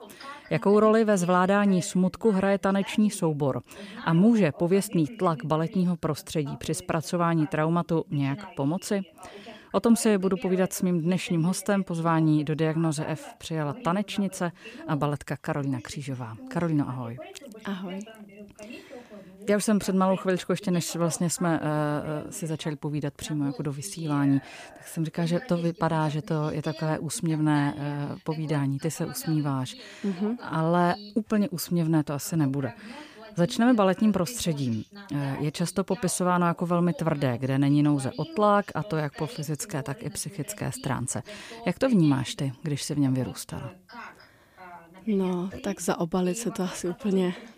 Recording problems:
voice in the background; noticeable; throughout; 20 dB below the speech

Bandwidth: 15 kHz